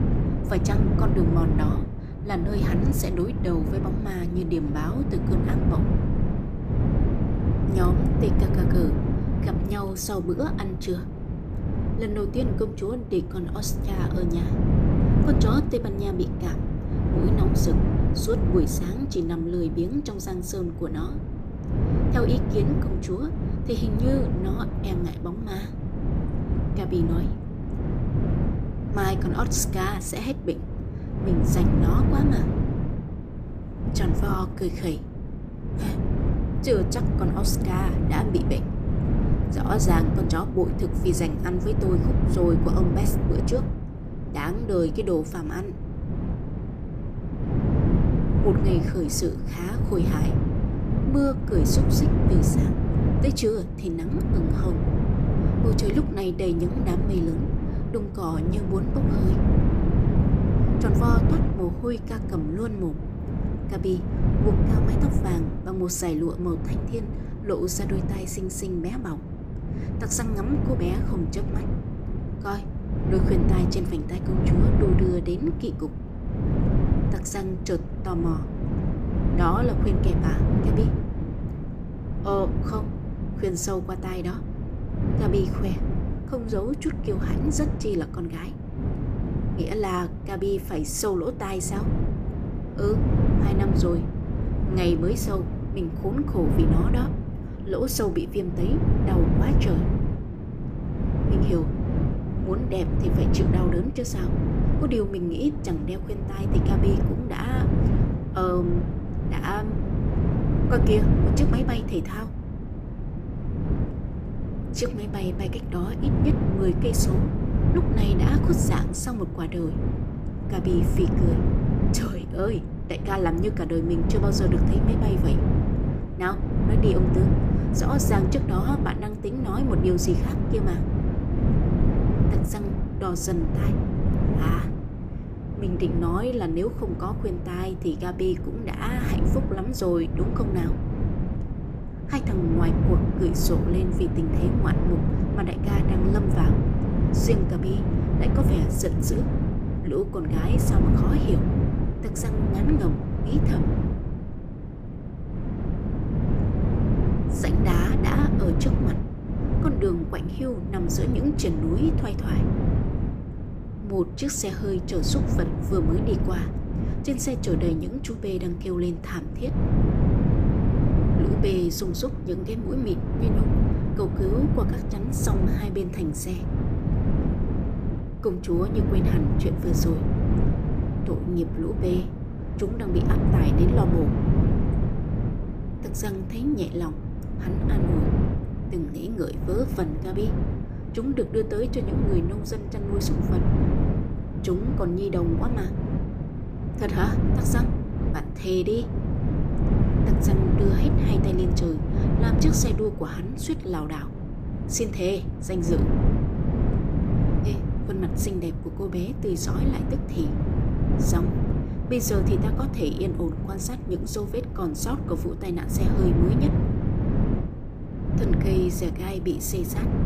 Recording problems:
wind noise on the microphone; heavy; 3 dB below the speech

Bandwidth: 14.5 kHz